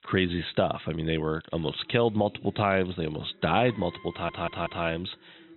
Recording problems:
high frequencies cut off; severe; nothing above 4 kHz
machinery noise; faint; throughout; 25 dB below the speech
voice in the background; faint; throughout; 25 dB below the speech
audio stuttering; at 4 s

